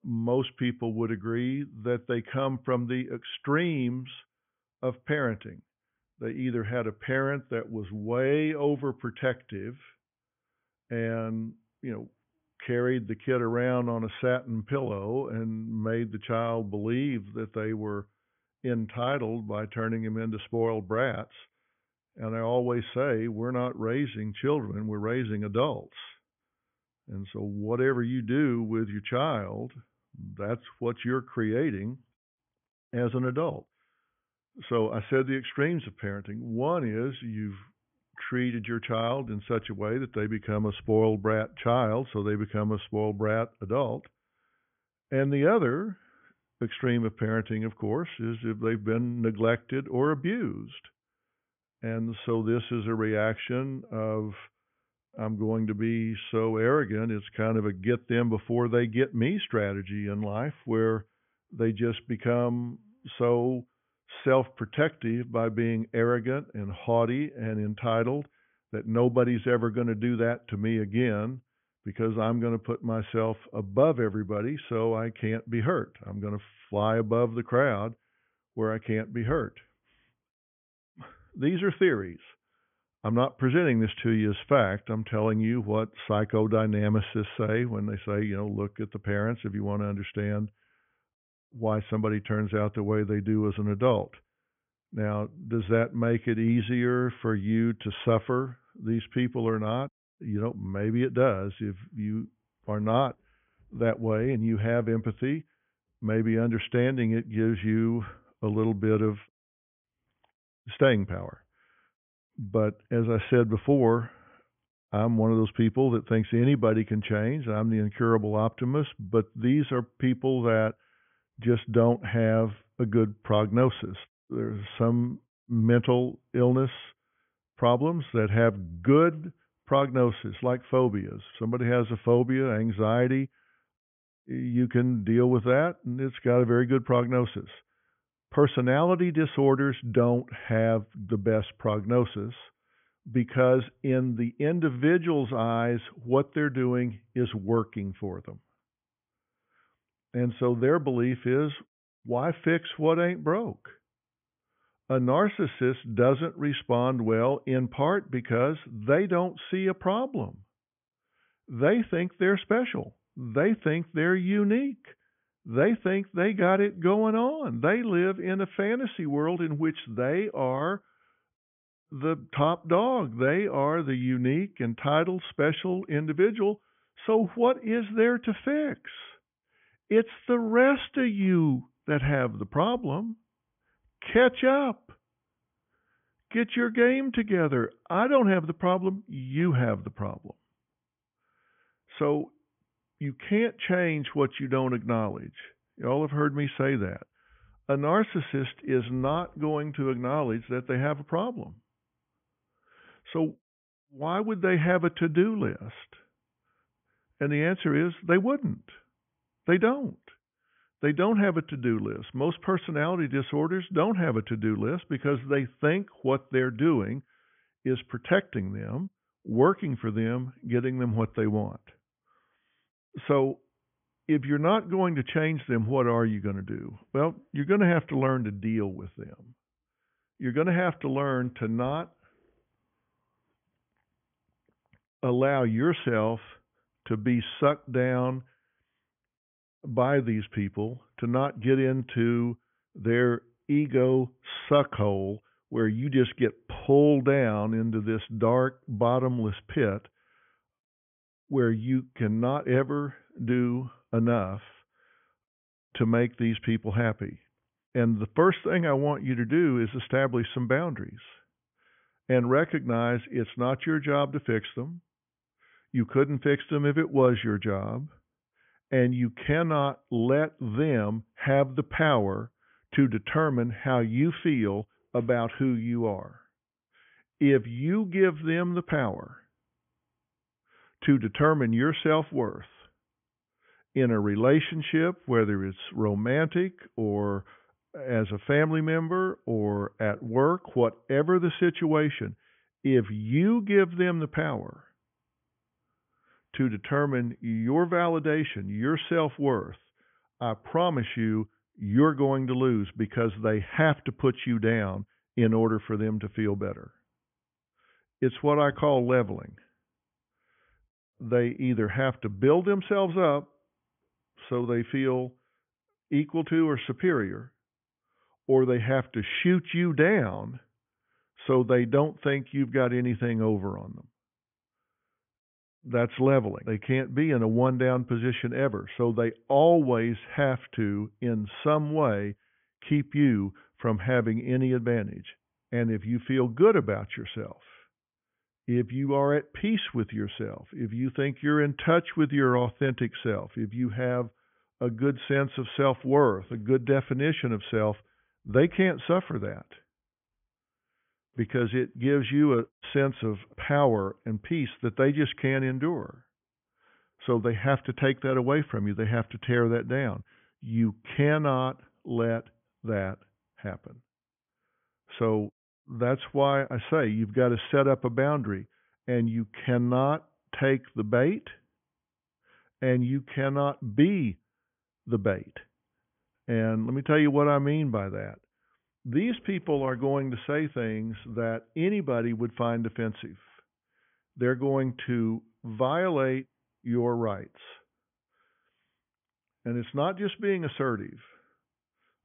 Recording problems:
high frequencies cut off; severe; nothing above 3.5 kHz

